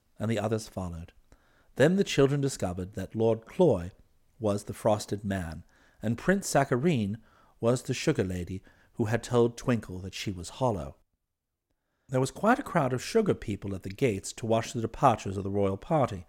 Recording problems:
none

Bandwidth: 16.5 kHz